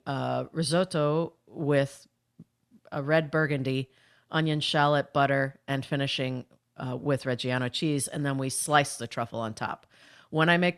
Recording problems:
none

